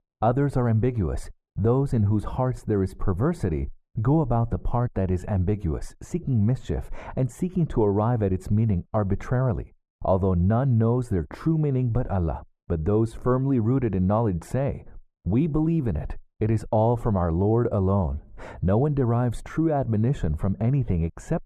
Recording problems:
muffled; very; fading above 2 kHz

